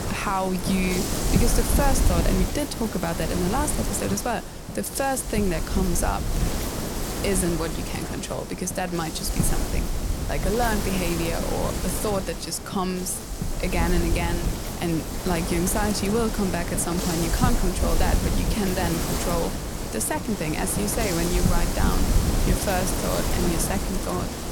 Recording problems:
wind noise on the microphone; heavy; 3 dB below the speech

